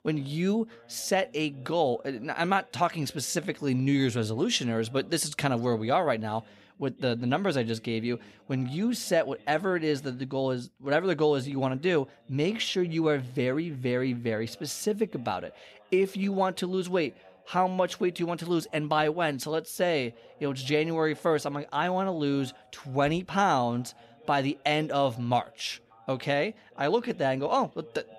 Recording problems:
voice in the background; faint; throughout; 25 dB below the speech

